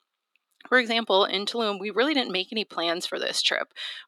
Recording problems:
thin; very; fading below 350 Hz

